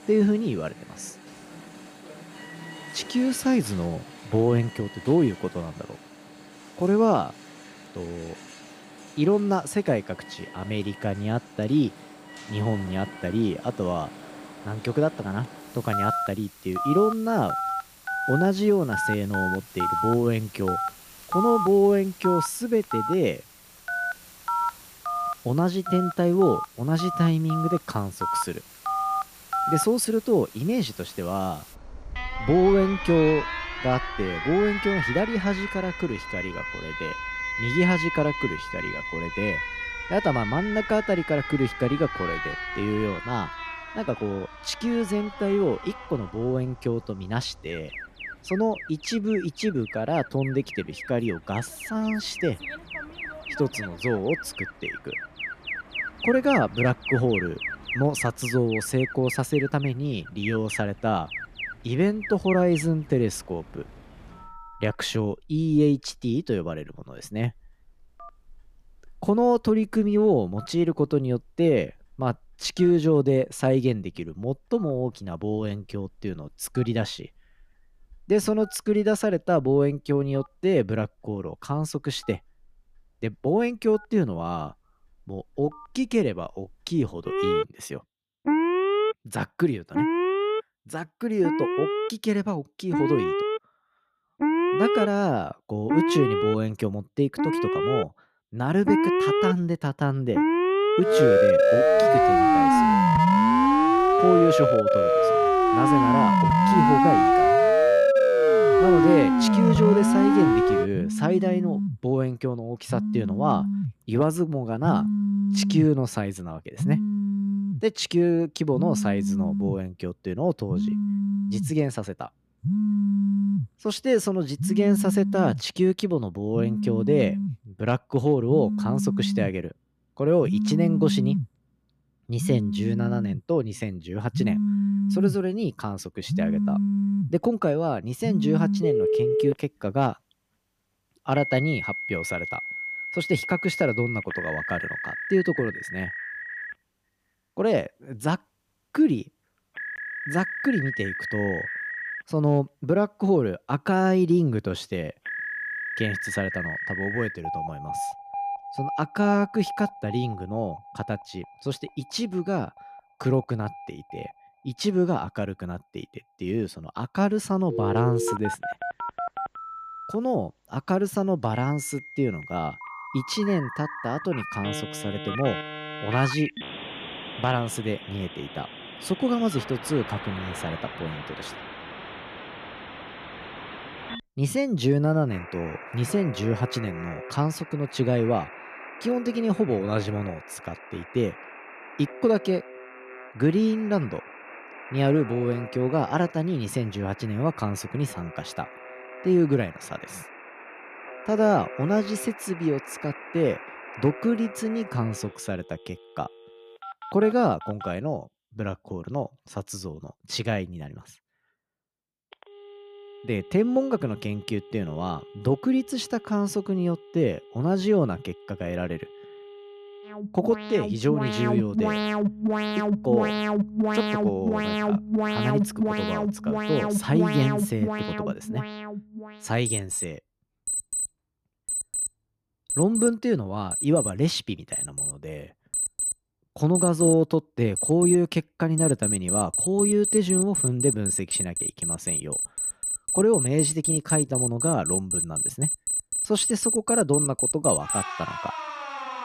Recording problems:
alarms or sirens; loud; throughout; as loud as the speech

